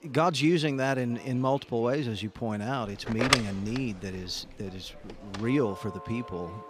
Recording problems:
alarms or sirens; loud; from 3 s on; 2 dB below the speech
murmuring crowd; faint; throughout; 25 dB below the speech

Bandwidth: 14.5 kHz